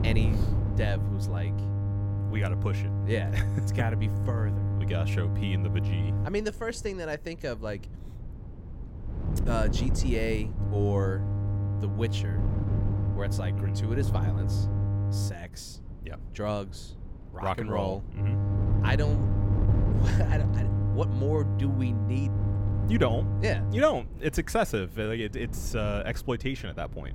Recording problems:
electrical hum; loud; until 6.5 s, from 11 to 15 s and from 18 to 24 s; 50 Hz, 7 dB below the speech
wind noise on the microphone; occasional gusts; 15 dB below the speech

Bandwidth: 16.5 kHz